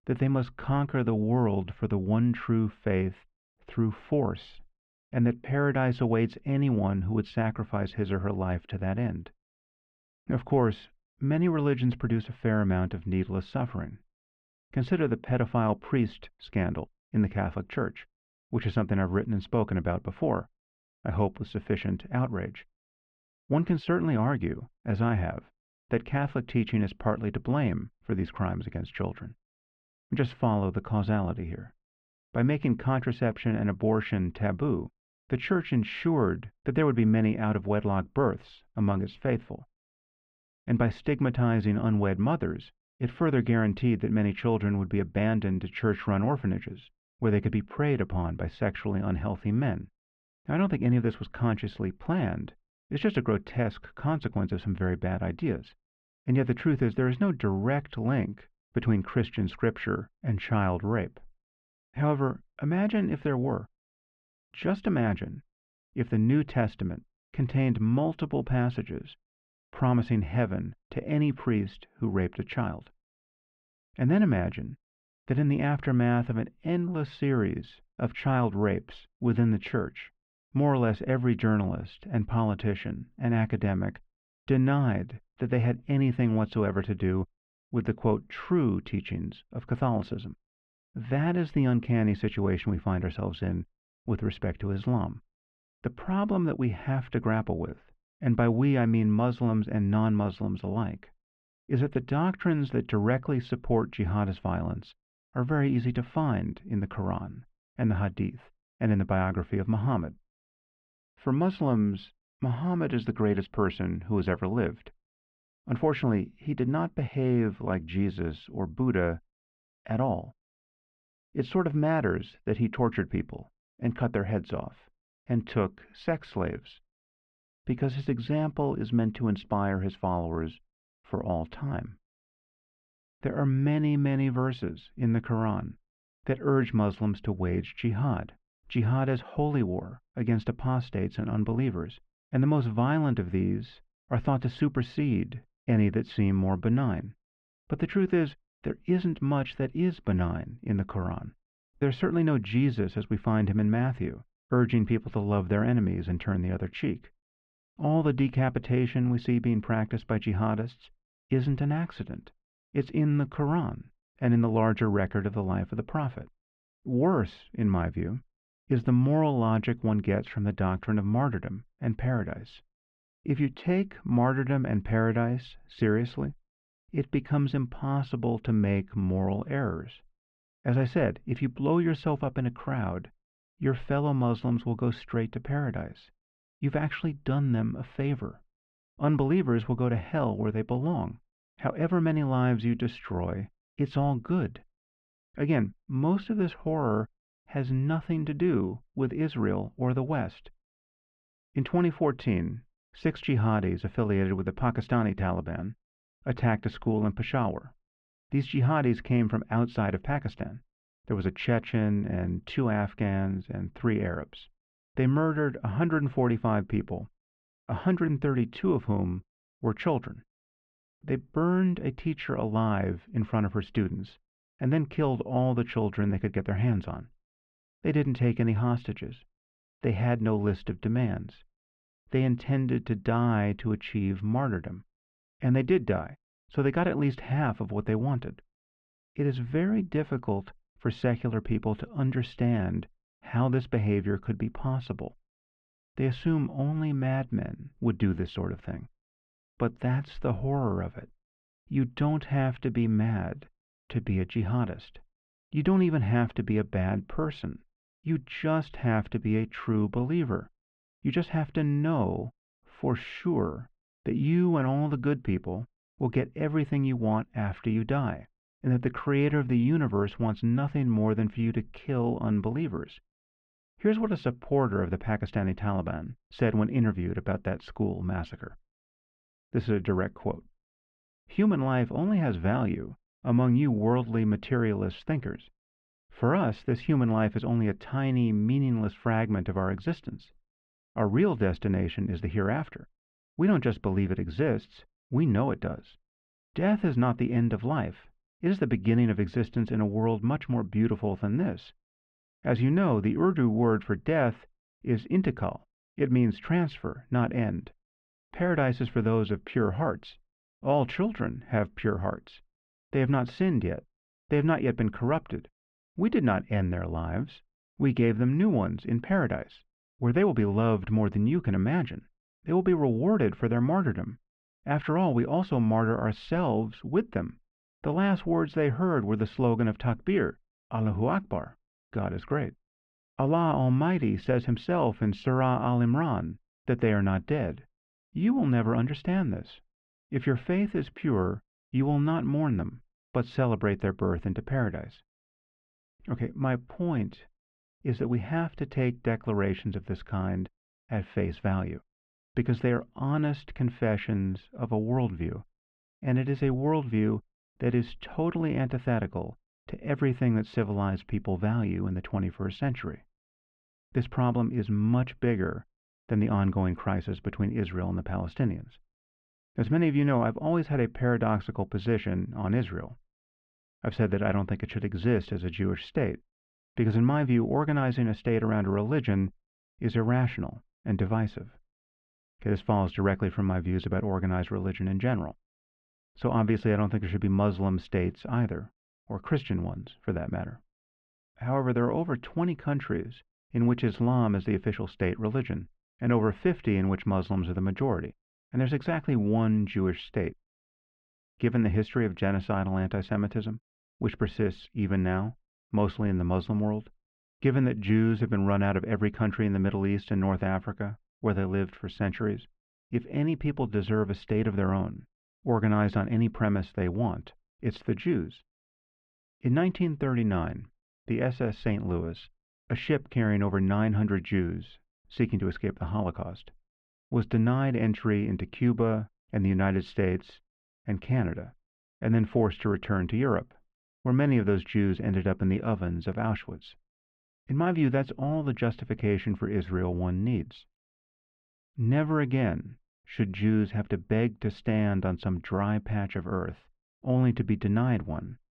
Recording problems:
muffled; very; fading above 3 kHz

